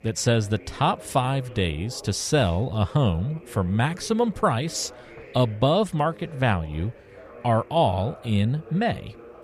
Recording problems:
voice in the background; faint; throughout; 20 dB below the speech

